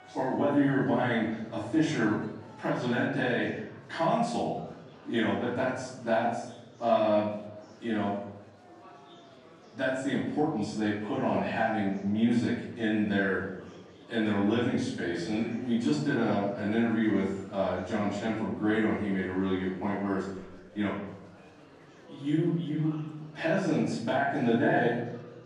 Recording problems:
off-mic speech; far
room echo; noticeable; dies away in 0.7 s
murmuring crowd; faint; throughout; 20 dB below the speech

